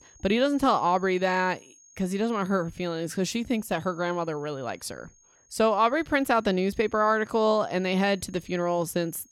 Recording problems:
high-pitched whine; faint; throughout; 6.5 kHz, 30 dB below the speech

